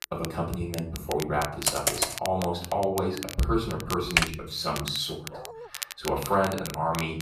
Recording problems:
off-mic speech; far
room echo; slight; dies away in 0.5 s
crackle, like an old record; noticeable; 10 dB below the speech
keyboard typing; loud; at 1.5 s and at 4 s; peak 5 dB above the speech
dog barking; faint; at 5.5 s; peak 10 dB below the speech

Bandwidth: 14.5 kHz